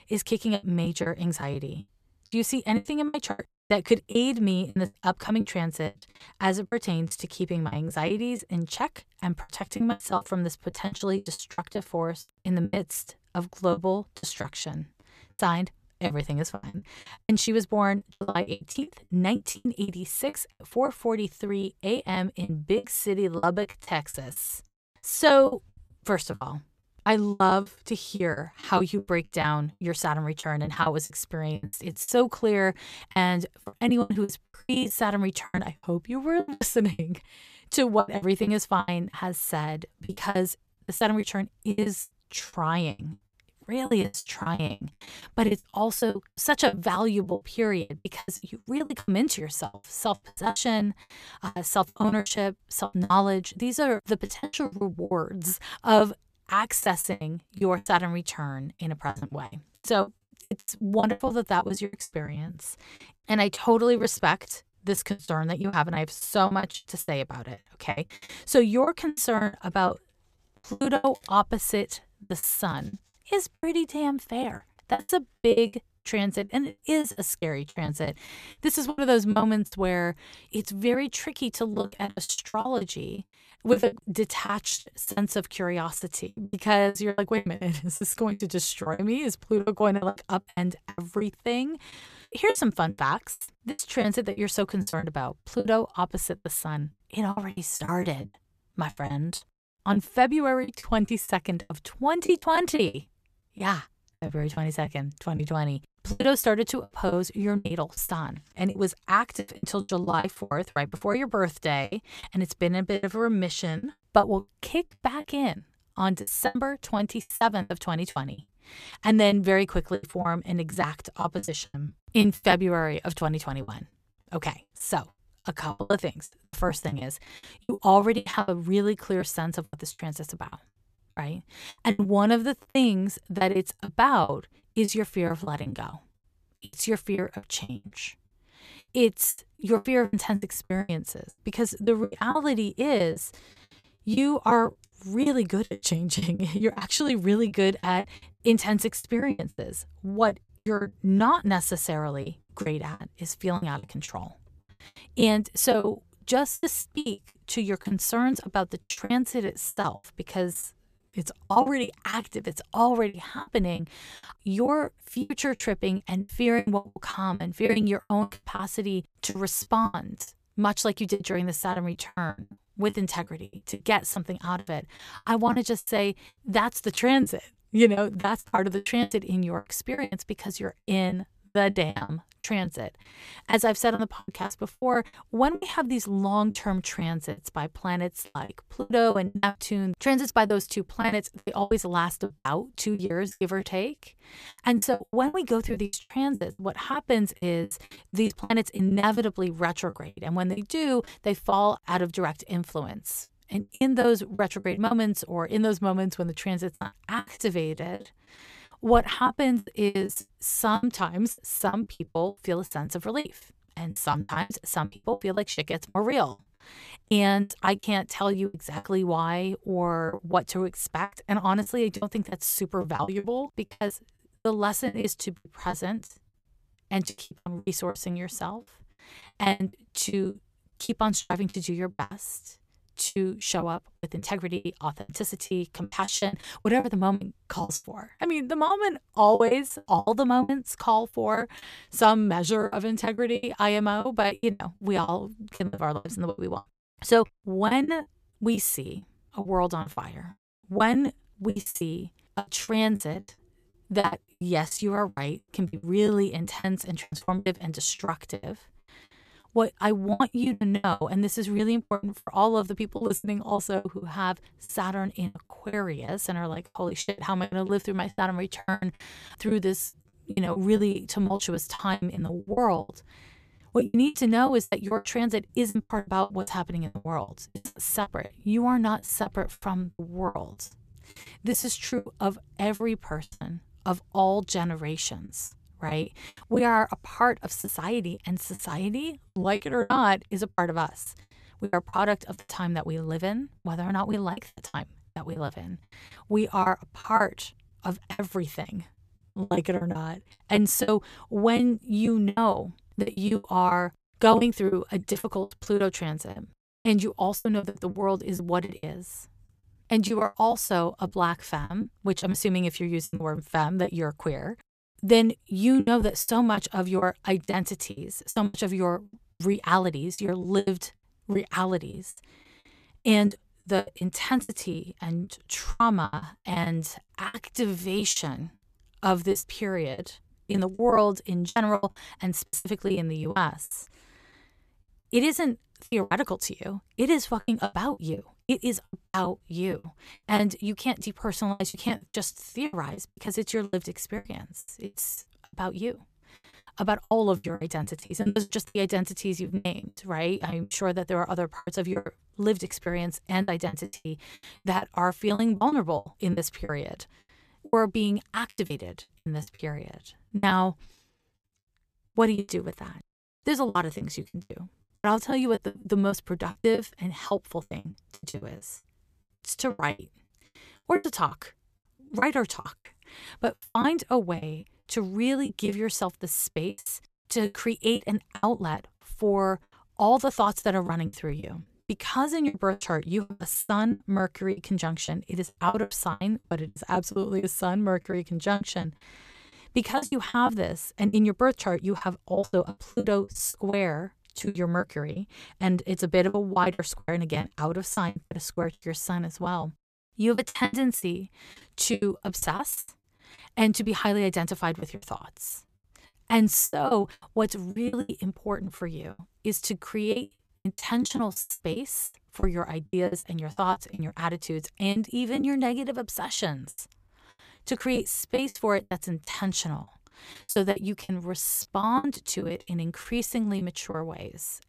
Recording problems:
choppy; very; 16% of the speech affected

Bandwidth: 14.5 kHz